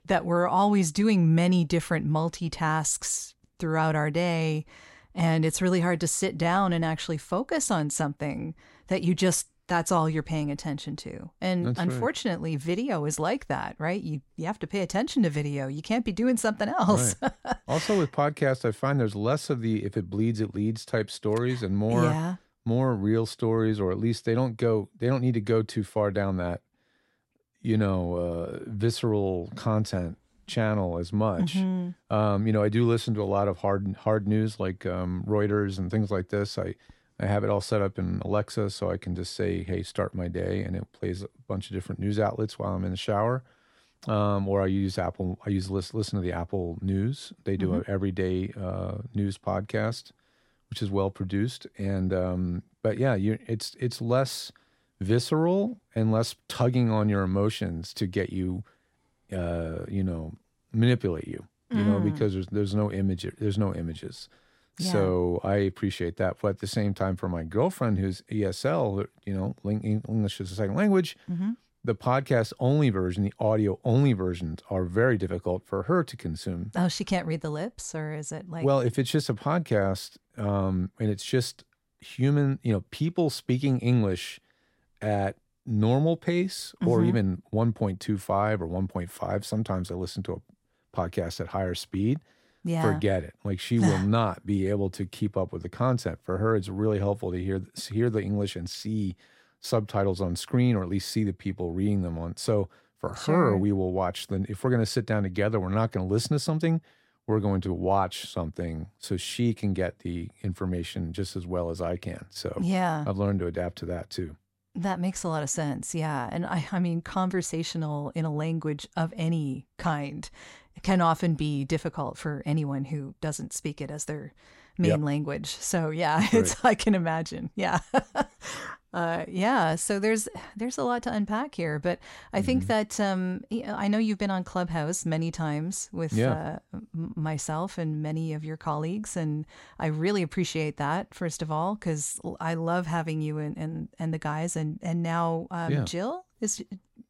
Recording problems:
none

